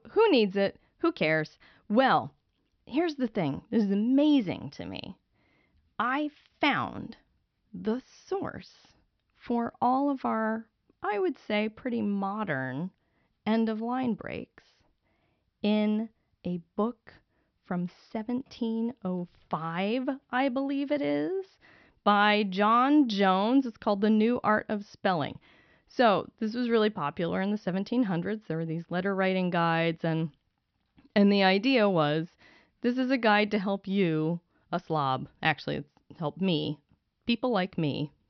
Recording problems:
high frequencies cut off; noticeable; nothing above 5.5 kHz

